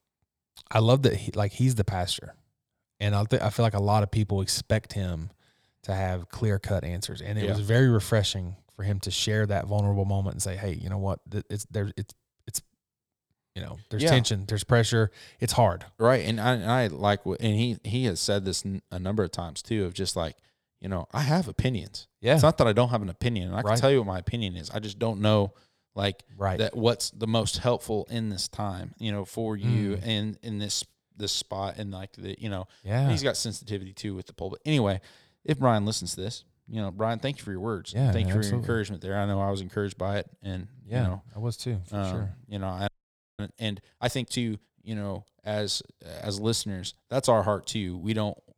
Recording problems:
audio freezing; at 43 s for 0.5 s

